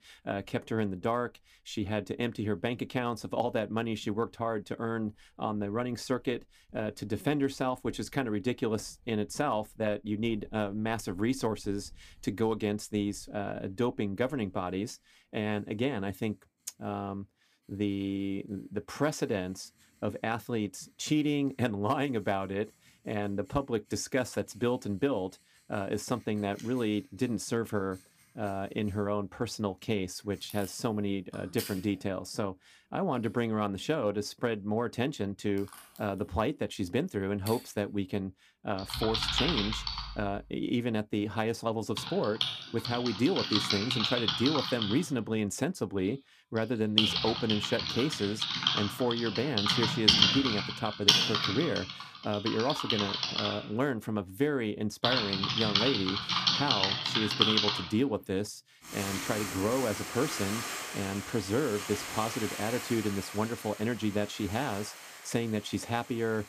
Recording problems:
household noises; very loud; throughout; 2 dB above the speech

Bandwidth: 15 kHz